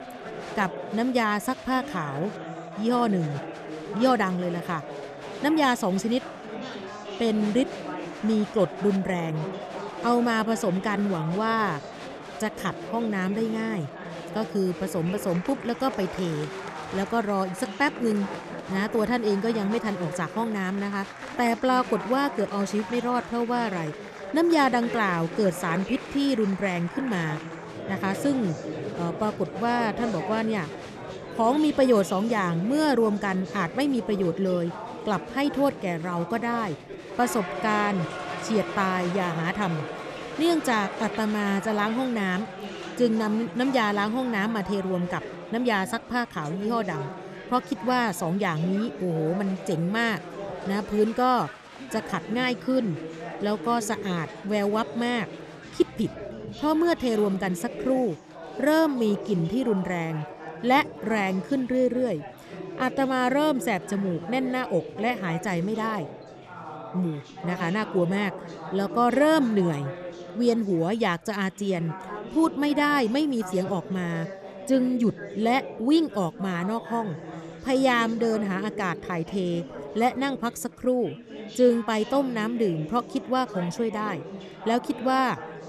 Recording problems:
chatter from many people; noticeable; throughout; 10 dB below the speech

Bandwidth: 13.5 kHz